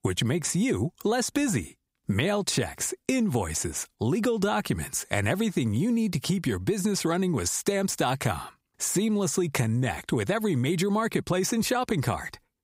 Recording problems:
squashed, flat; somewhat

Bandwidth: 15.5 kHz